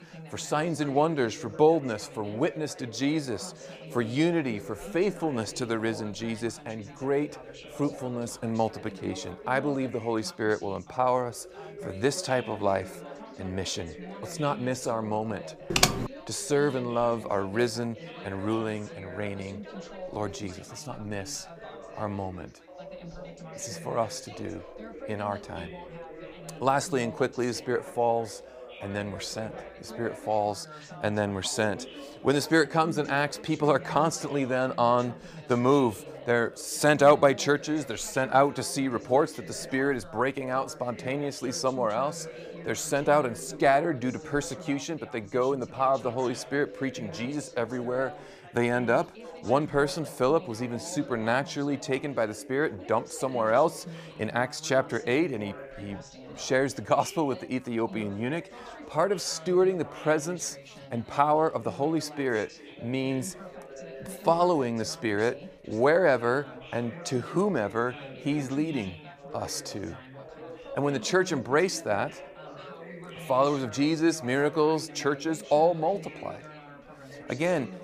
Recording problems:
background chatter; noticeable; throughout; 3 voices, 15 dB below the speech
keyboard typing; loud; at 16 s; peak 5 dB above the speech

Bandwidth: 15 kHz